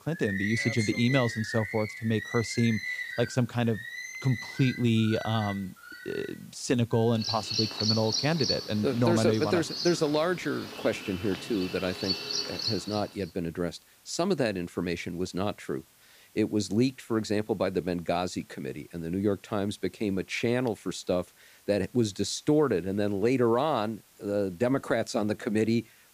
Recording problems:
animal sounds; loud; until 13 s; 5 dB below the speech
hiss; faint; throughout; 30 dB below the speech

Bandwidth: 15 kHz